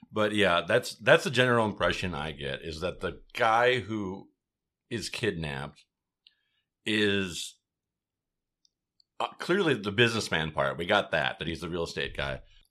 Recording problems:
none

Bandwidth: 14.5 kHz